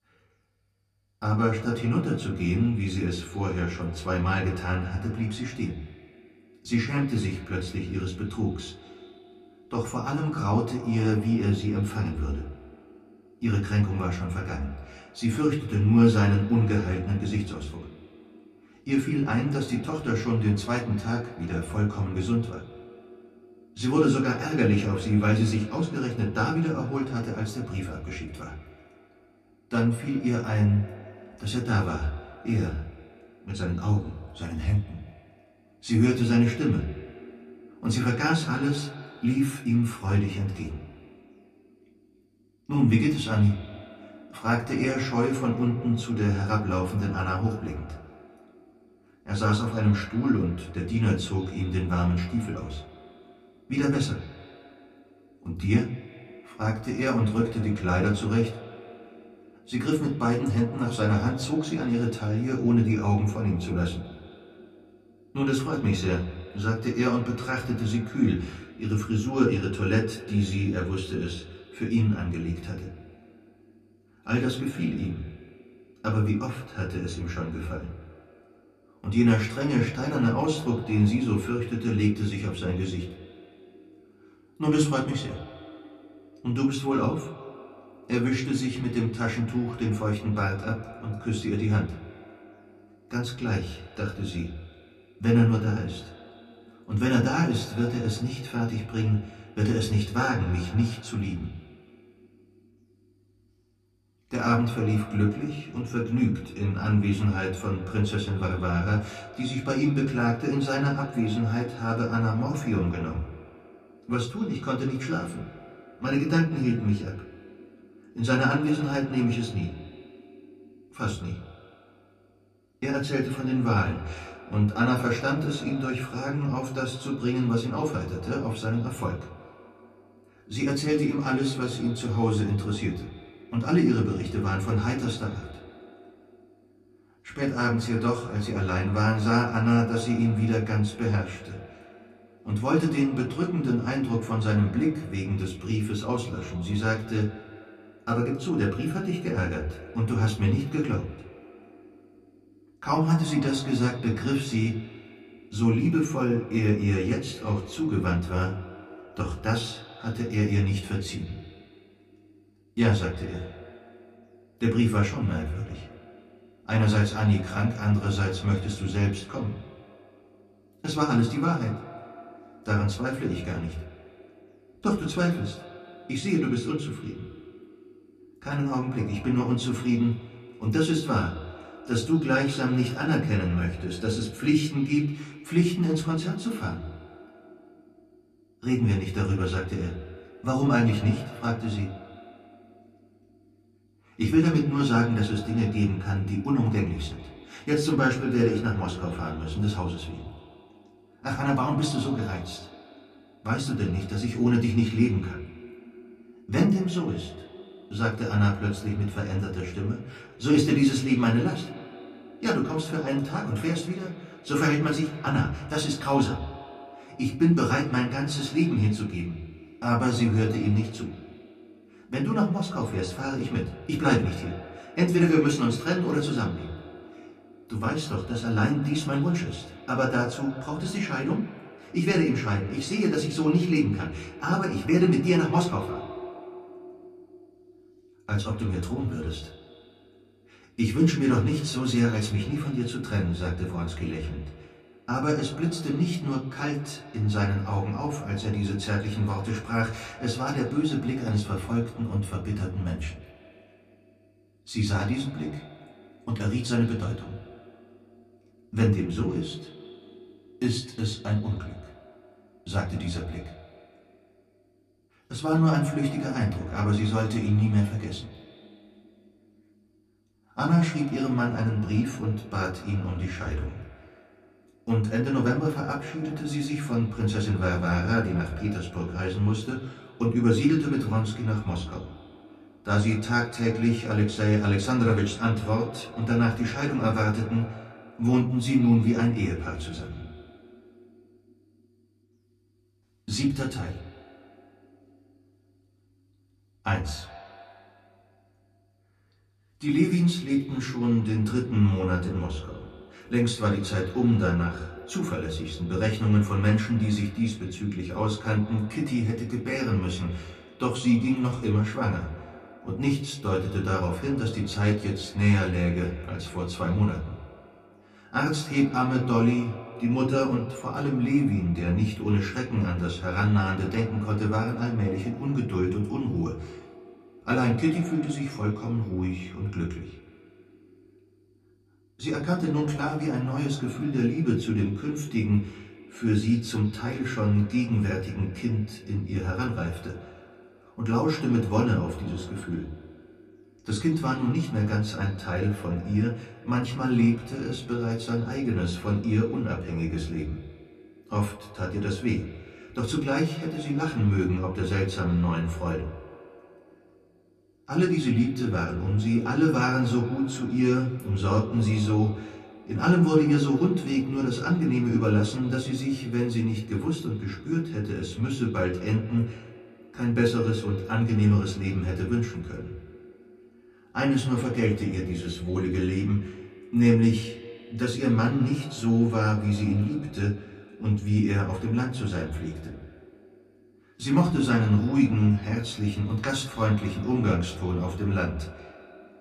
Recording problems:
off-mic speech; far
echo of what is said; faint; throughout; 180 ms later, 20 dB below the speech
room echo; very slight; dies away in 0.3 s

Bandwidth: 14.5 kHz